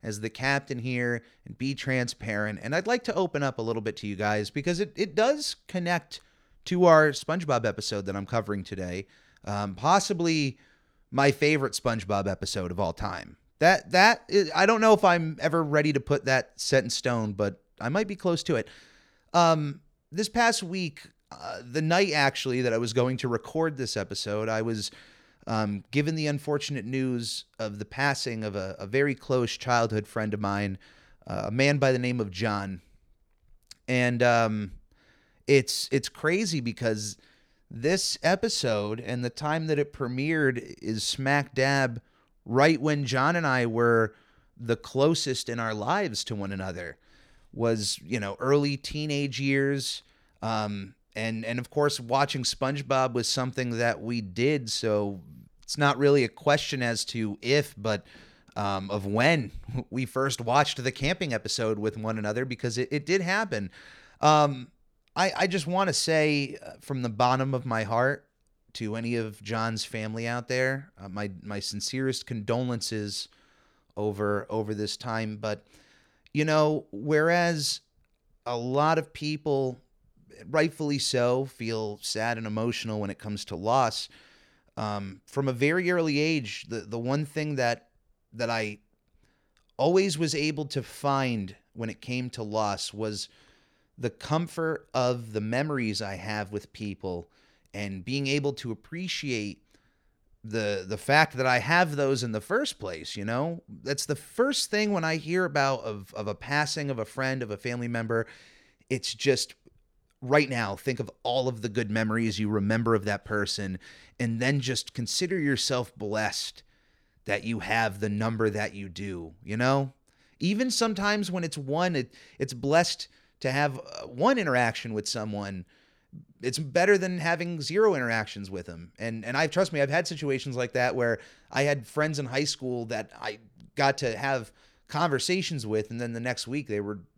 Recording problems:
none

